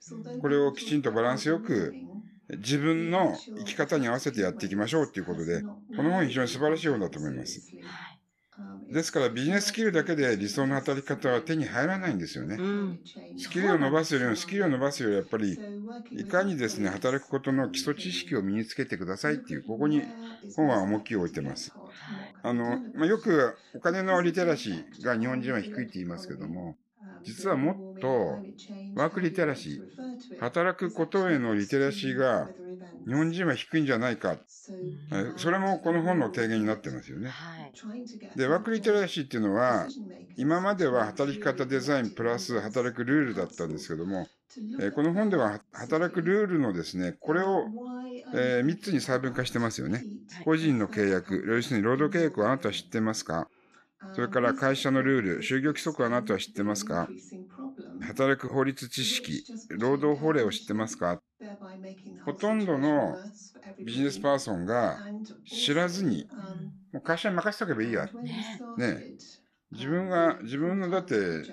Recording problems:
voice in the background; noticeable; throughout; 15 dB below the speech

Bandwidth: 14 kHz